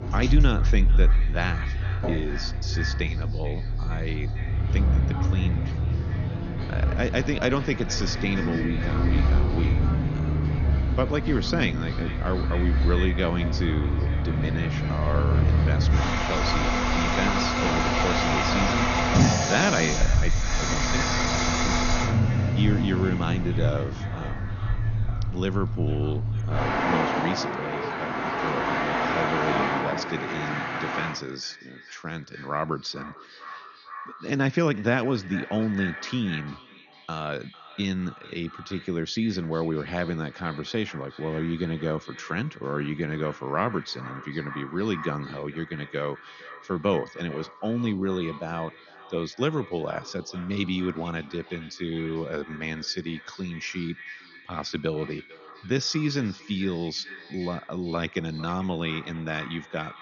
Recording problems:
echo of what is said; noticeable; throughout; 450 ms later, 15 dB below the speech
garbled, watery; slightly; nothing above 6.5 kHz
traffic noise; very loud; until 31 s; 4 dB above the speech

